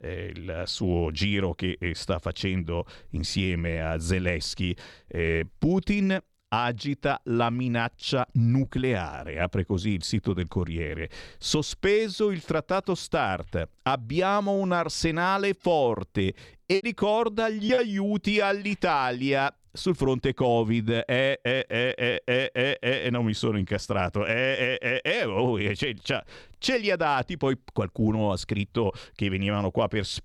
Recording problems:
choppy; occasionally; from 15 to 18 s; 4% of the speech affected

